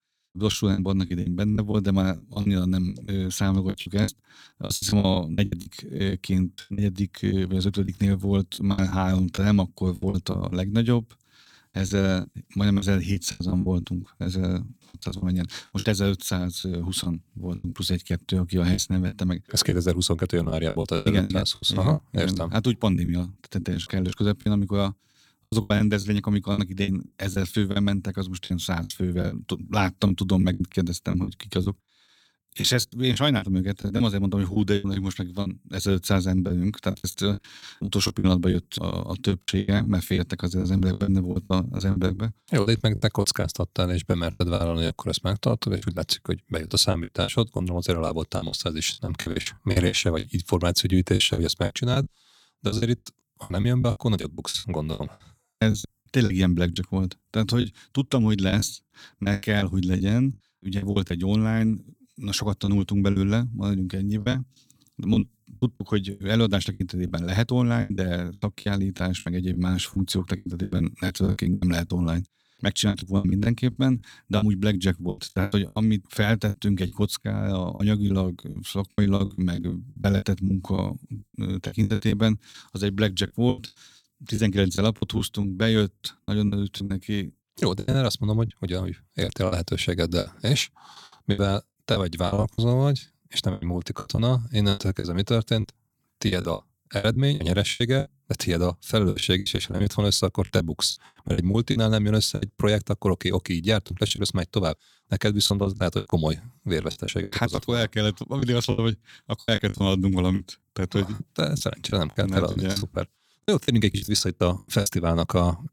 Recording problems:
choppy; very; 12% of the speech affected

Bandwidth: 17.5 kHz